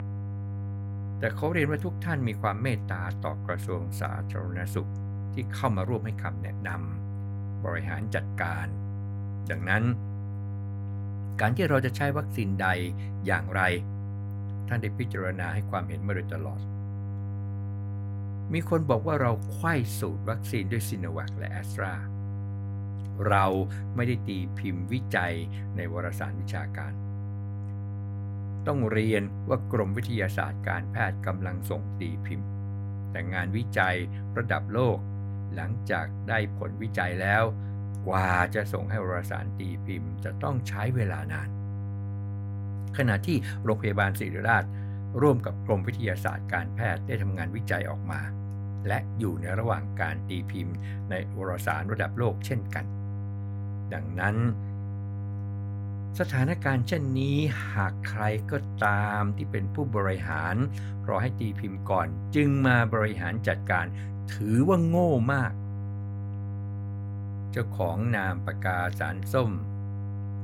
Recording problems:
electrical hum; noticeable; throughout; 50 Hz, 15 dB below the speech

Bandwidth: 16 kHz